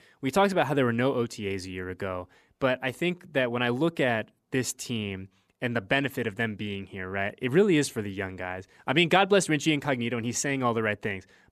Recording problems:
none

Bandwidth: 14.5 kHz